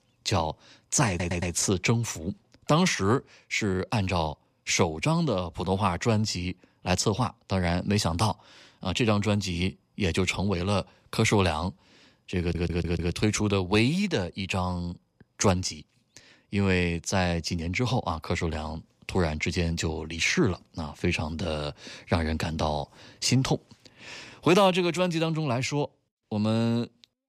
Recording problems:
audio stuttering; at 1 s and at 12 s

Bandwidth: 14.5 kHz